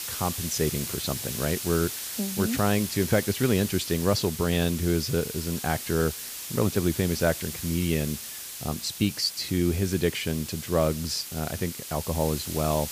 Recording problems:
hiss; loud; throughout; 6 dB below the speech

